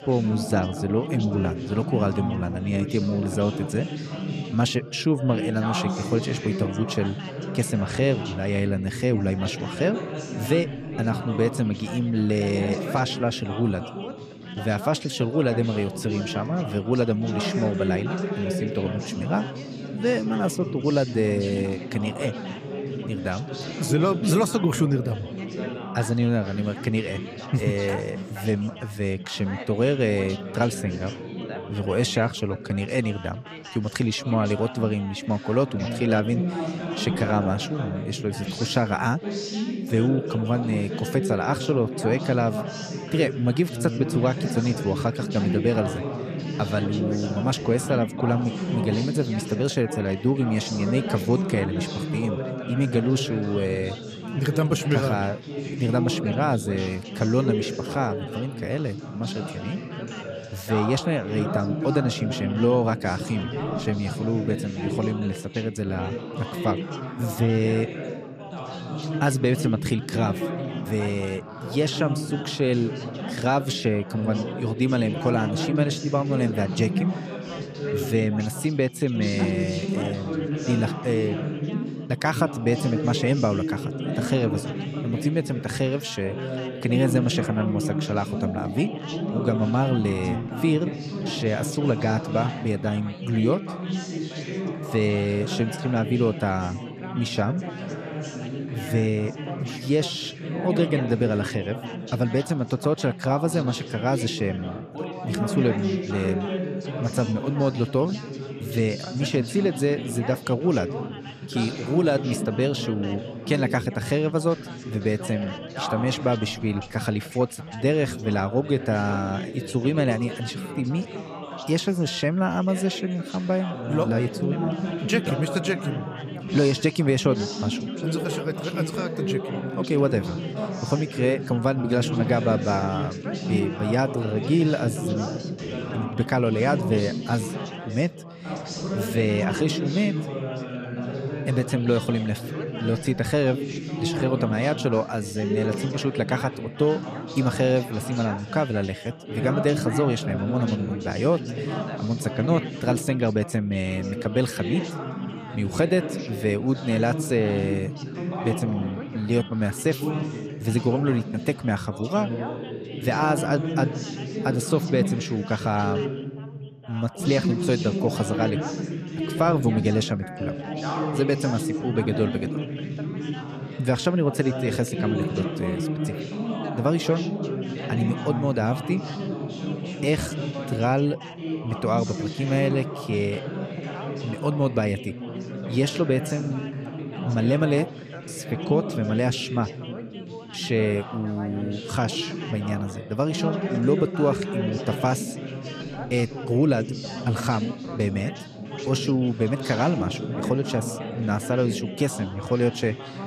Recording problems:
background chatter; loud; throughout; 4 voices, 6 dB below the speech

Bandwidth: 15 kHz